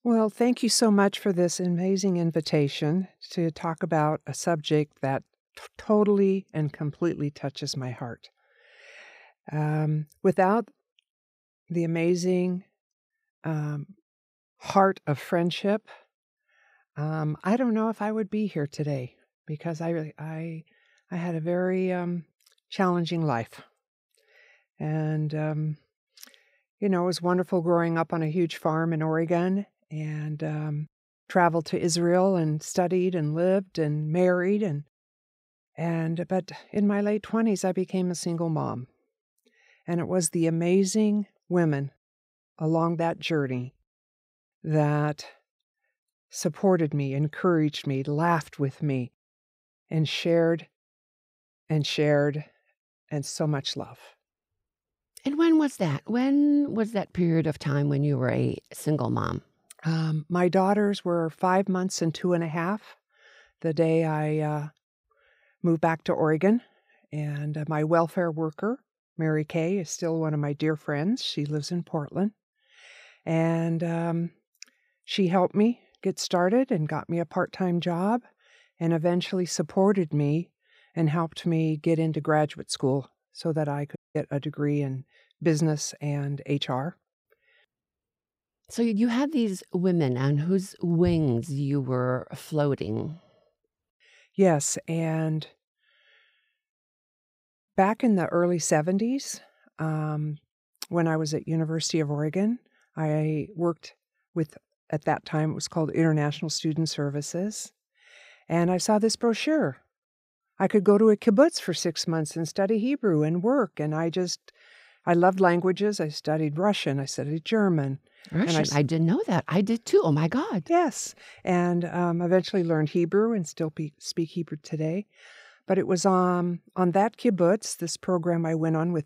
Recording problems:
audio cutting out; at 1:24

